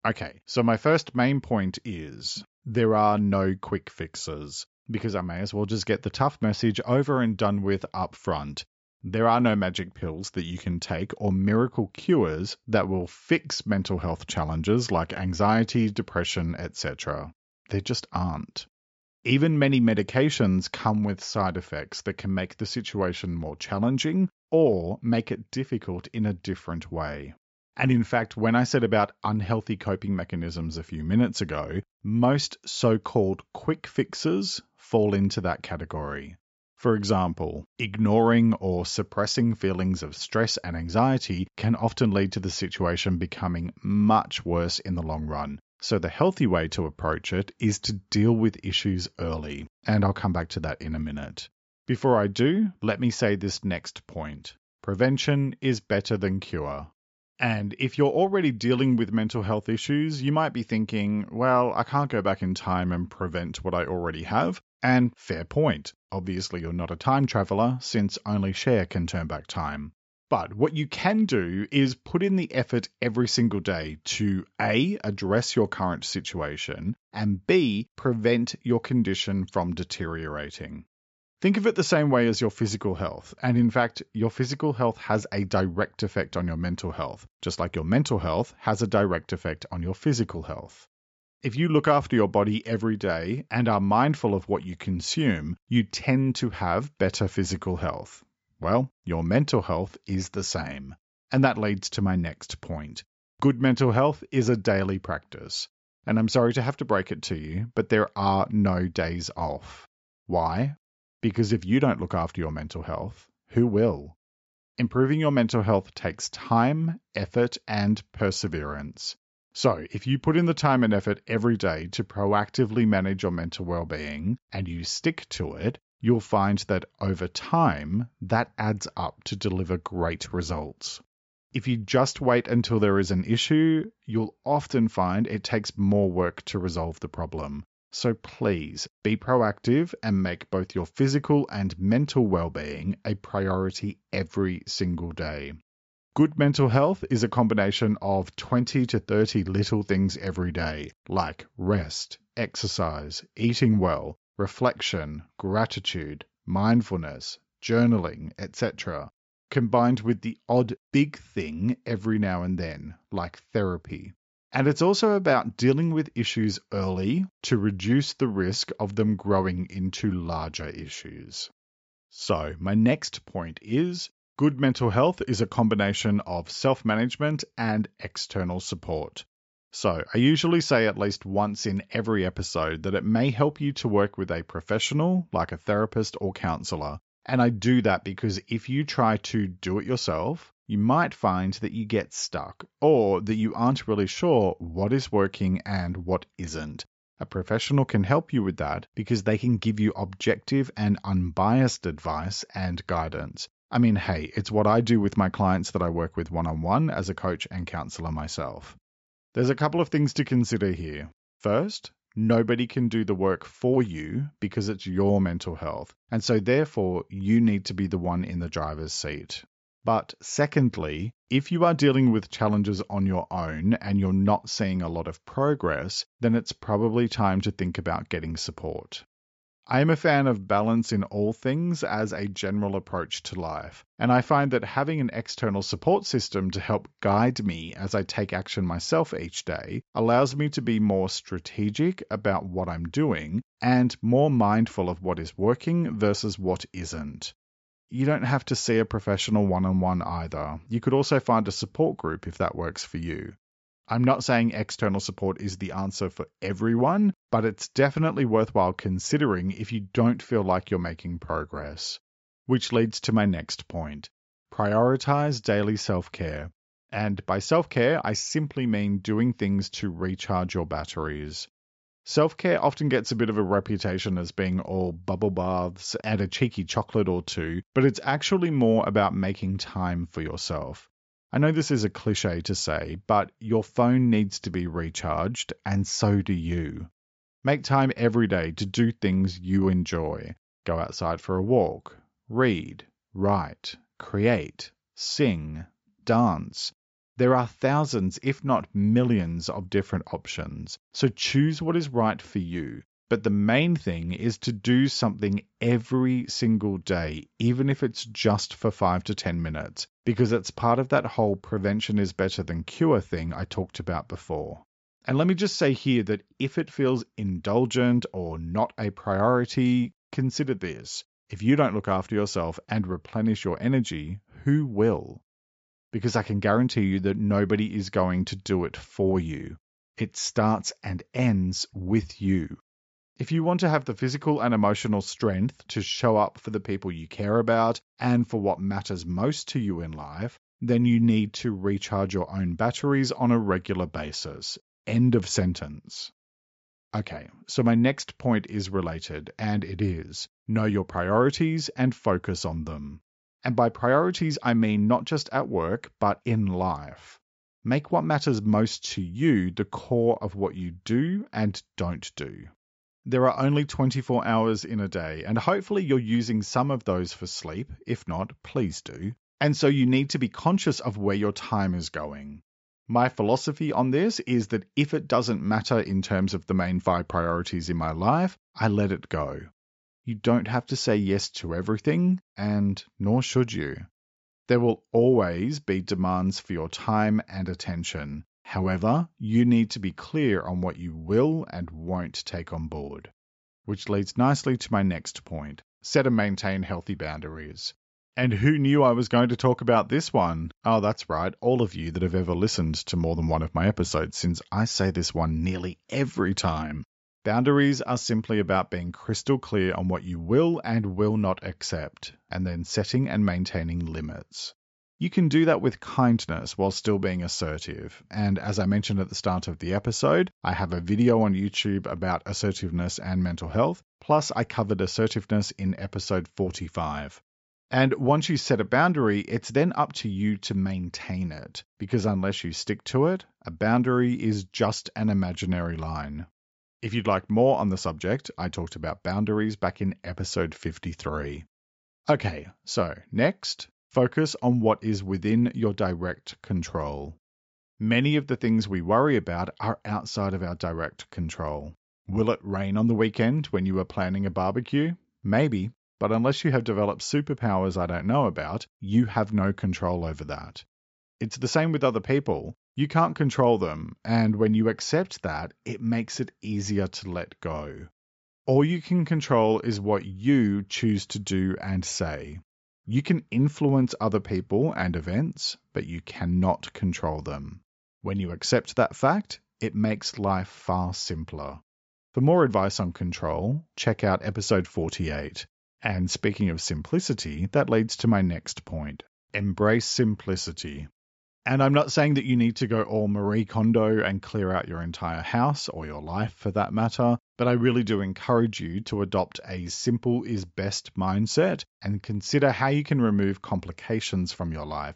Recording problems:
high frequencies cut off; noticeable; nothing above 8 kHz

